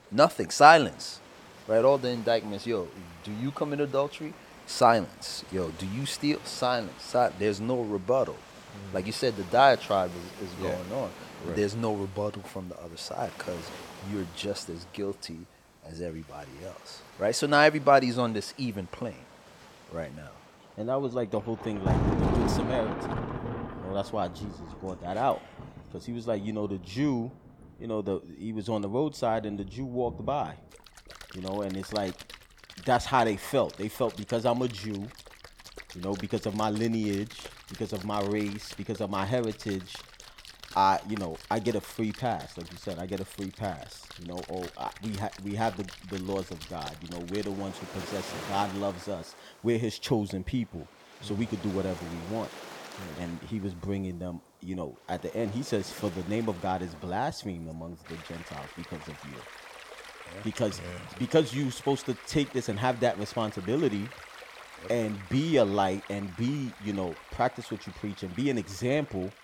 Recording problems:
rain or running water; noticeable; throughout; 10 dB below the speech

